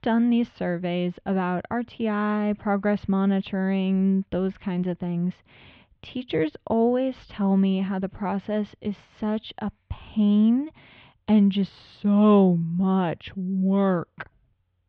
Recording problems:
muffled; very; fading above 3.5 kHz

